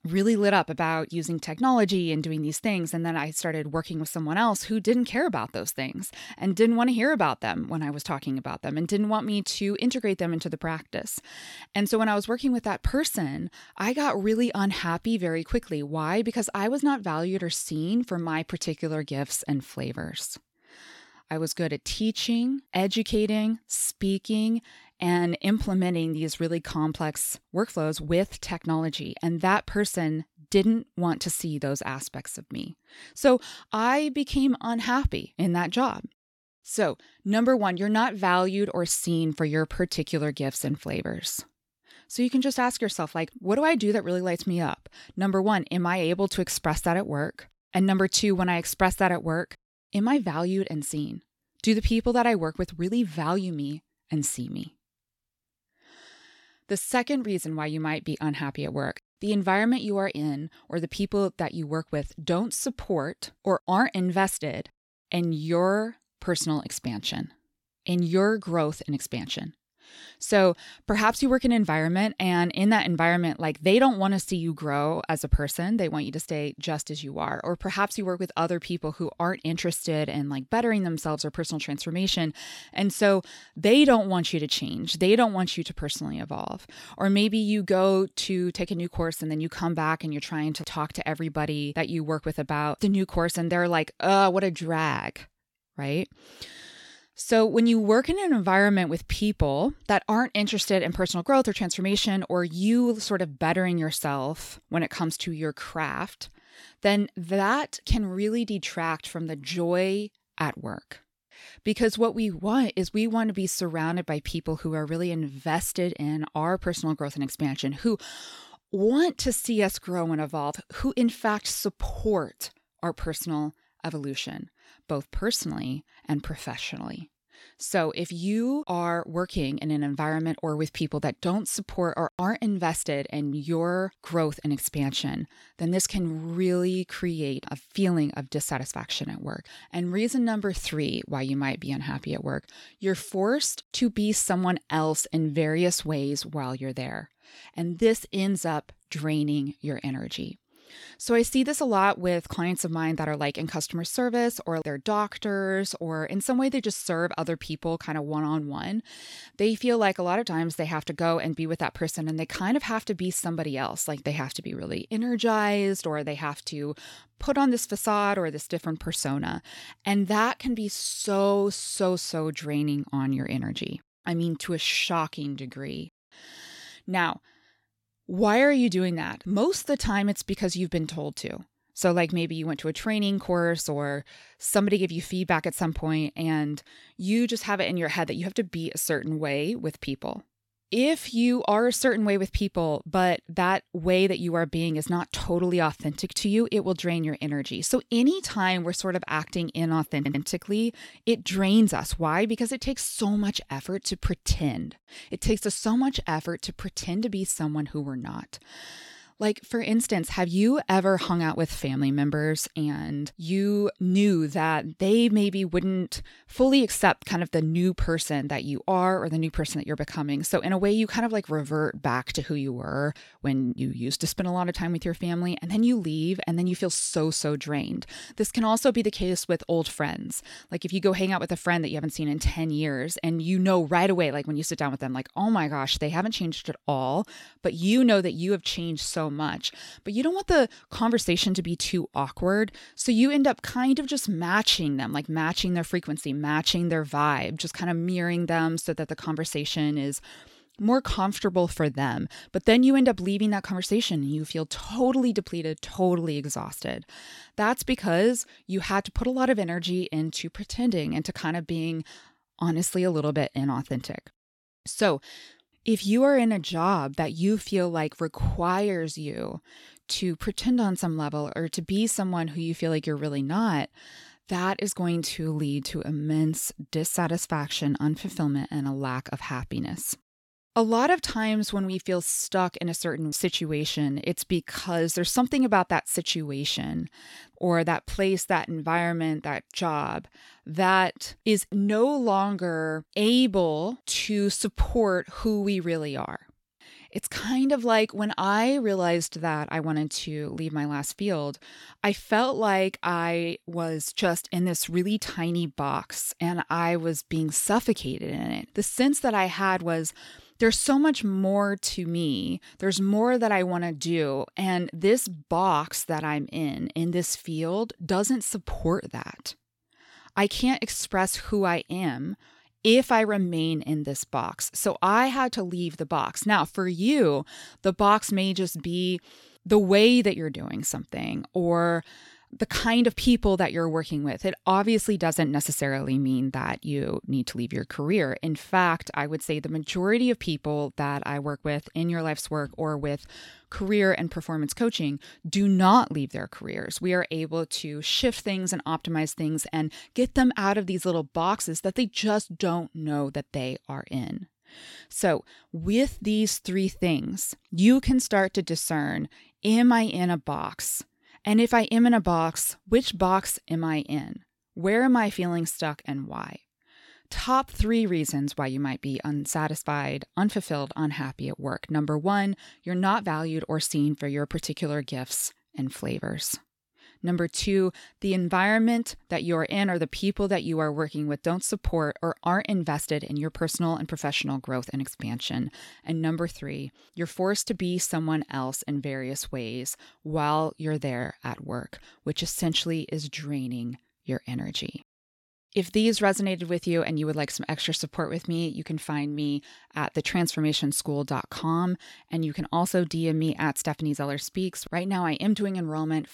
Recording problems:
audio stuttering; at 3:20

